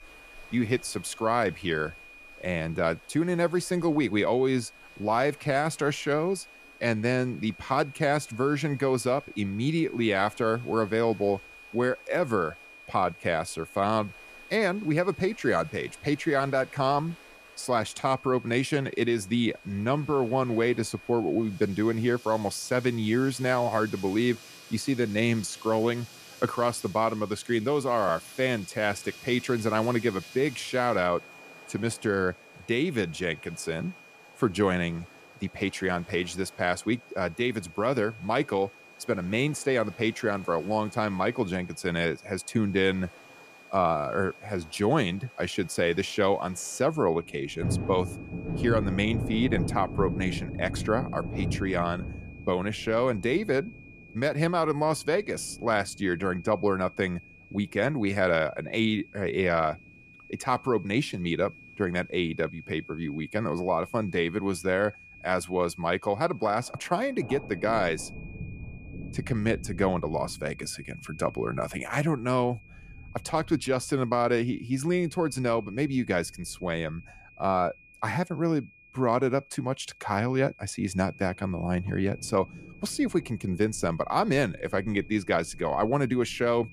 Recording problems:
rain or running water; noticeable; throughout; 15 dB below the speech
high-pitched whine; faint; throughout; 2.5 kHz, 20 dB below the speech

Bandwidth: 14.5 kHz